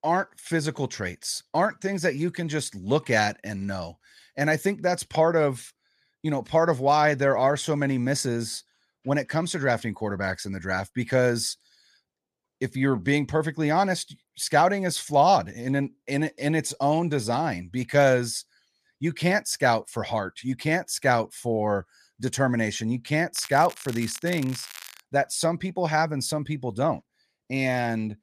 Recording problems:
crackling; noticeable; from 23 to 25 s; 15 dB below the speech

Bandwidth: 14.5 kHz